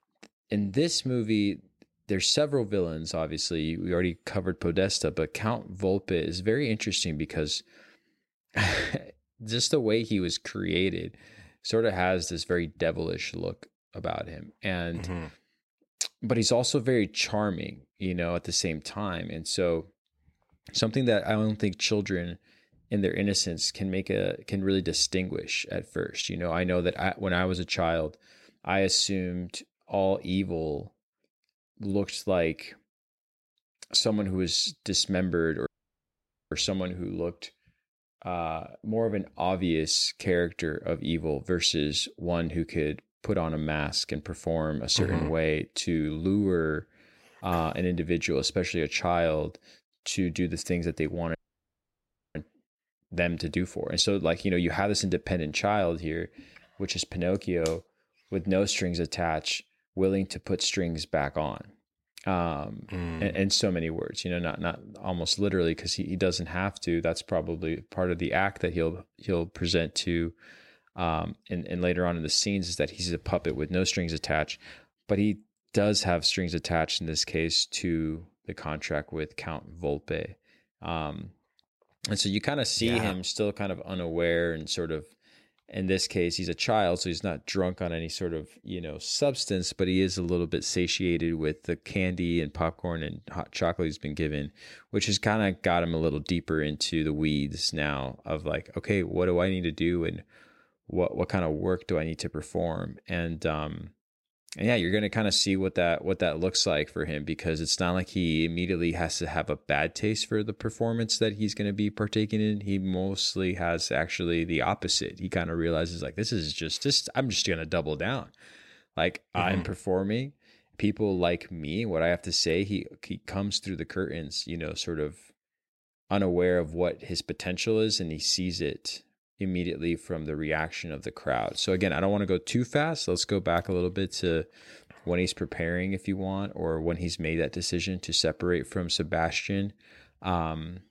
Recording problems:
audio cutting out; at 36 s for 1 s and at 51 s for 1 s

